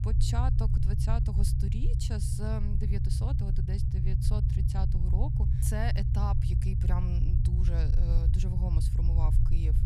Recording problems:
low rumble; loud; throughout; 2 dB below the speech

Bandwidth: 14.5 kHz